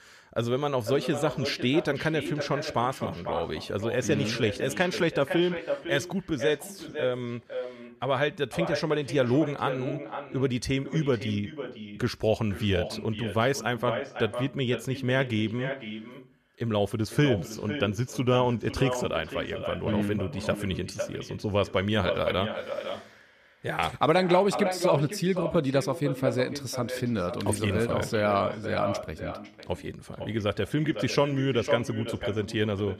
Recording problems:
echo of what is said; strong; throughout; 500 ms later, 8 dB below the speech

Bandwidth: 14.5 kHz